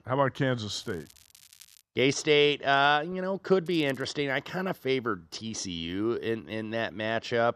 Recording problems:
crackling; faint; from 0.5 to 2 s and at 3.5 s; 25 dB below the speech

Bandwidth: 13.5 kHz